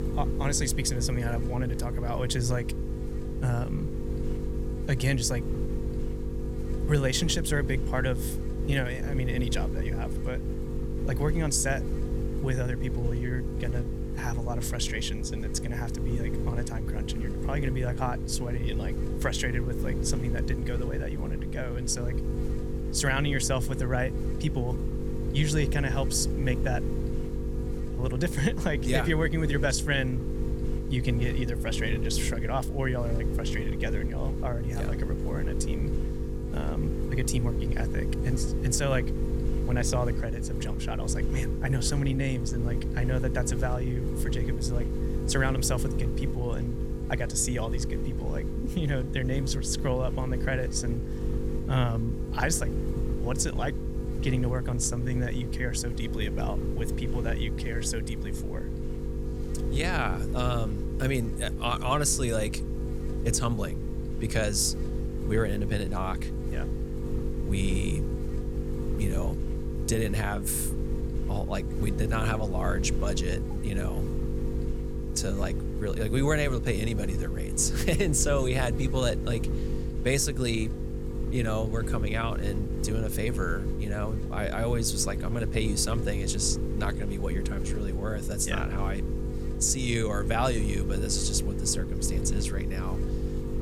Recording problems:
electrical hum; loud; throughout; 50 Hz, 7 dB below the speech

